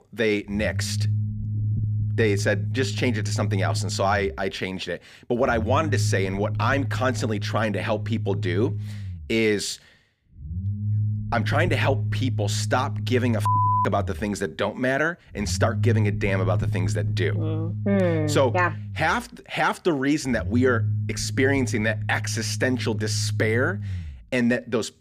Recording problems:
low rumble; noticeable; throughout; 15 dB below the speech

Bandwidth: 15 kHz